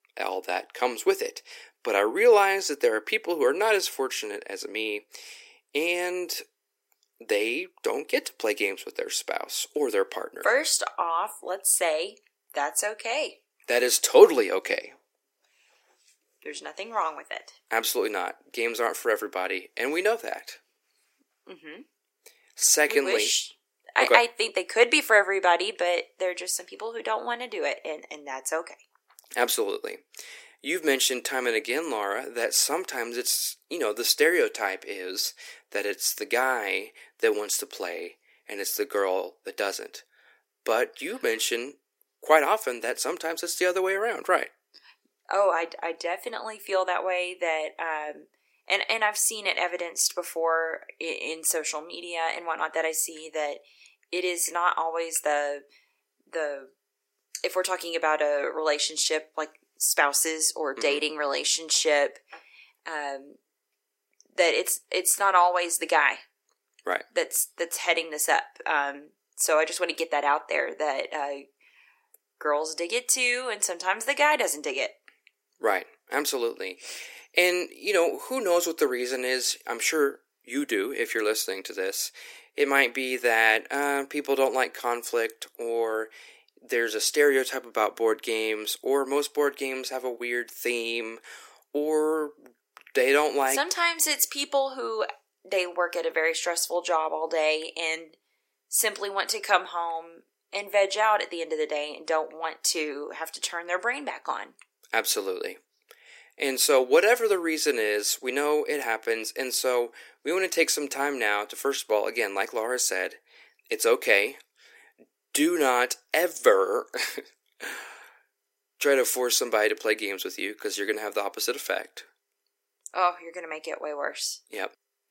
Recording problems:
thin; somewhat; fading below 300 Hz

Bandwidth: 16 kHz